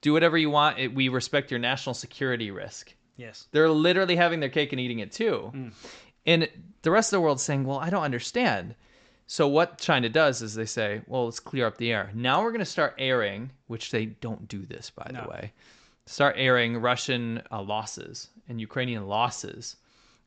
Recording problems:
high frequencies cut off; noticeable; nothing above 8 kHz

